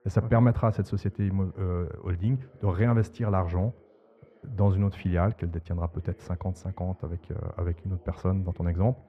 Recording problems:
muffled; very; fading above 3.5 kHz
background chatter; faint; throughout; 2 voices, 30 dB below the speech

